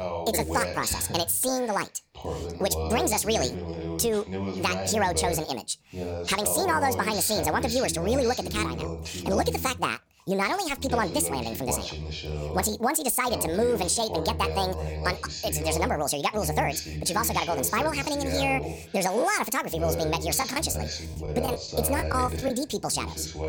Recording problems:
wrong speed and pitch; too fast and too high; 1.6 times normal speed
voice in the background; loud; throughout; 7 dB below the speech
choppy; very; from 20 to 23 s; 10% of the speech affected

